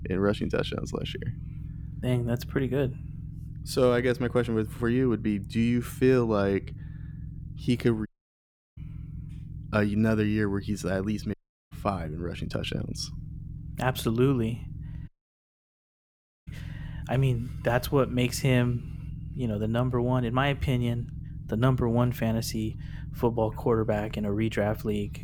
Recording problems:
low rumble; faint; throughout; 20 dB below the speech
audio cutting out; at 8 s for 0.5 s, at 11 s and at 15 s for 1.5 s

